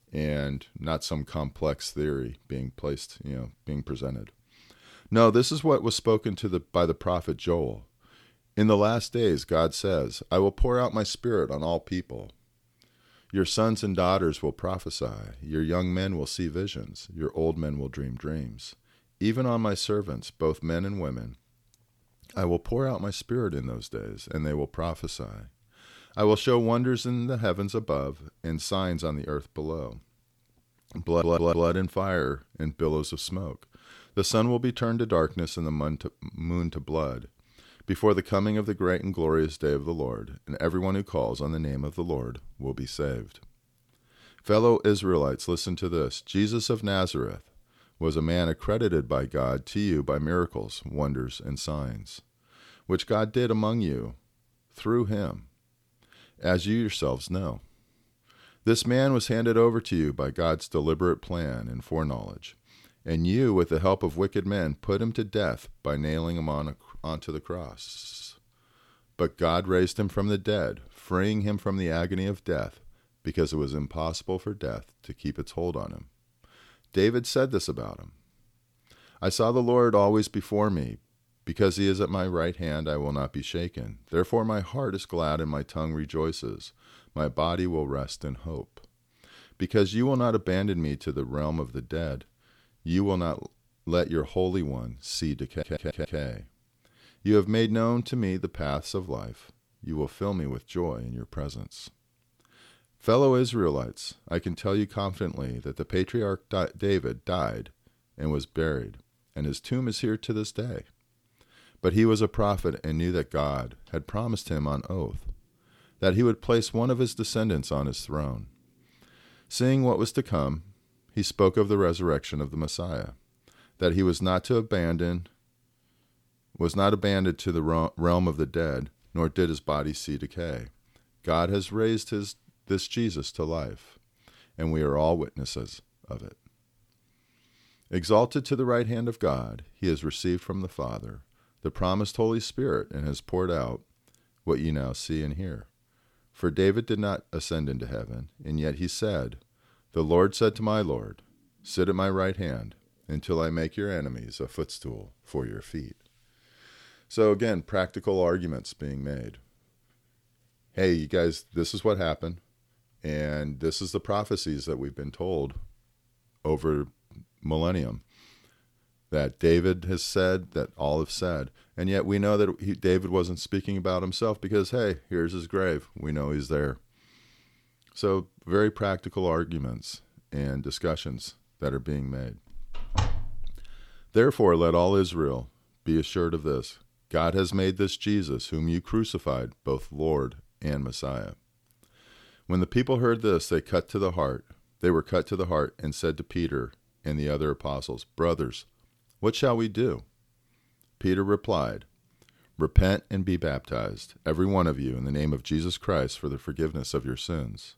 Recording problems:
audio stuttering; at 31 s, at 1:08 and at 1:35
door banging; noticeable; from 3:03 to 3:04; peak 2 dB below the speech

